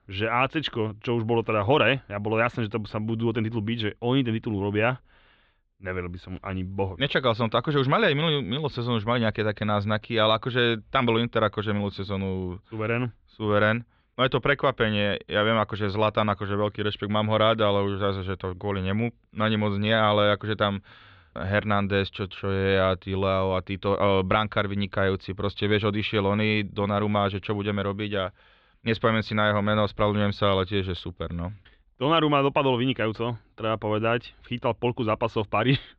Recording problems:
muffled; slightly; fading above 3.5 kHz

